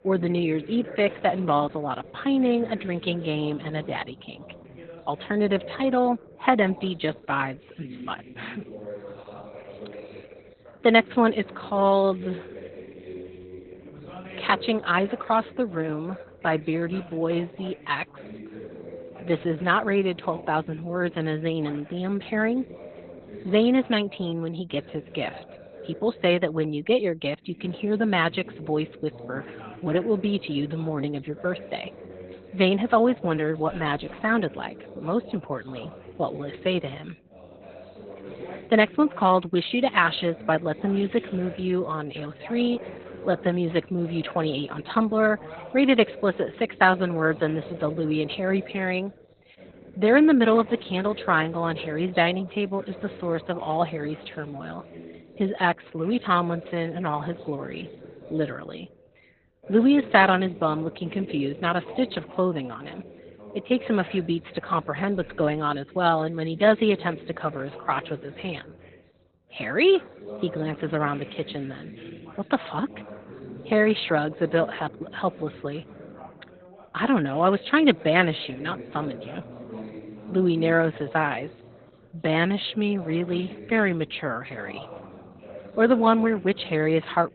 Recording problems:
garbled, watery; badly; nothing above 4 kHz
background chatter; noticeable; throughout; 2 voices, 20 dB below the speech

